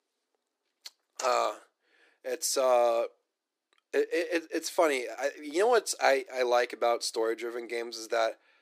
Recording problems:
thin; somewhat; fading below 350 Hz

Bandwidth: 15 kHz